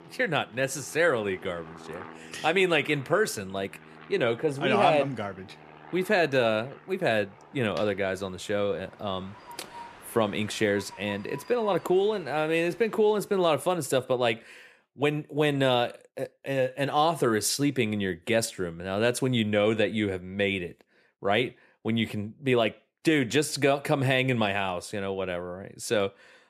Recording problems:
train or aircraft noise; faint; until 13 s; 20 dB below the speech

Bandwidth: 14.5 kHz